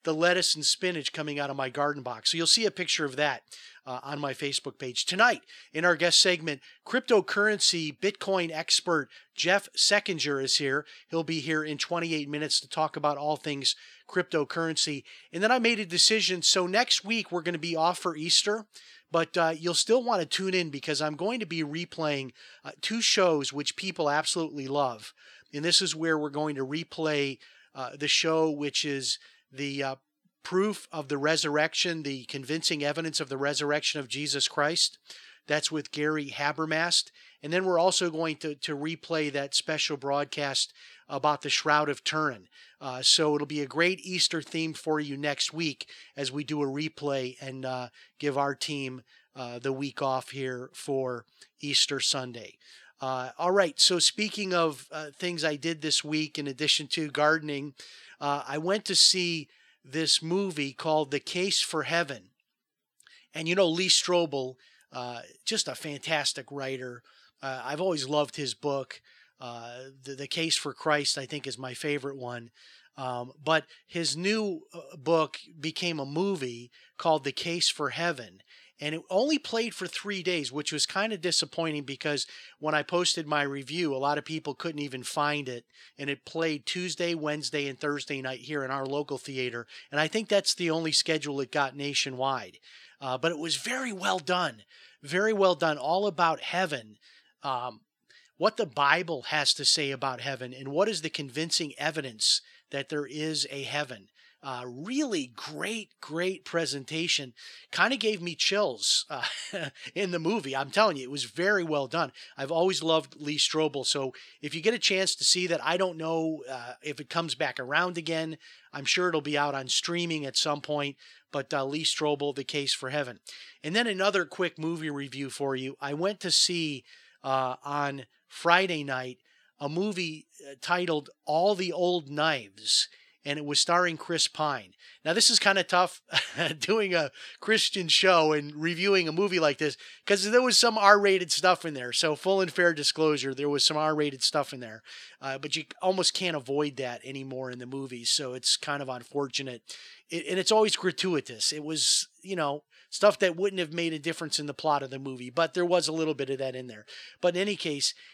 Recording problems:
thin; somewhat; fading below 300 Hz

